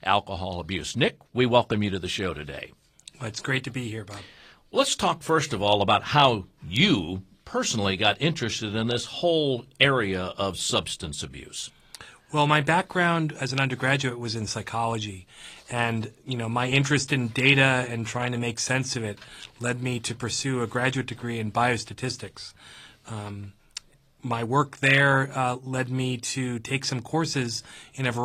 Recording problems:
garbled, watery; slightly; nothing above 13.5 kHz
abrupt cut into speech; at the end

